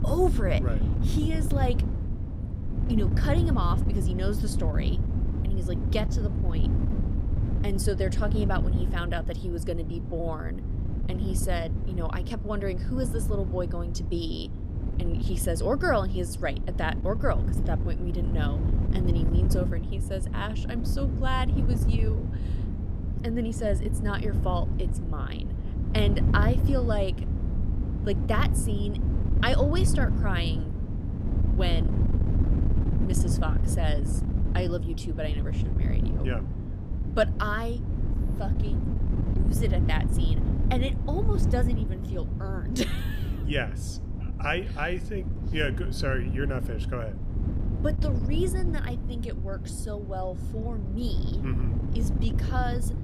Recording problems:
wind noise on the microphone; heavy; 7 dB below the speech

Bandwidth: 15.5 kHz